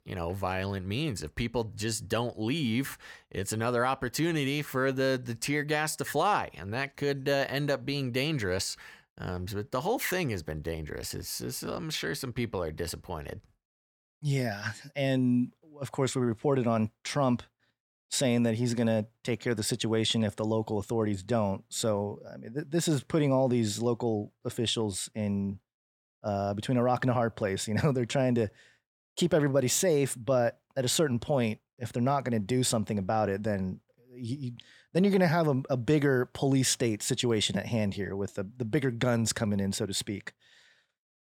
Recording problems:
none

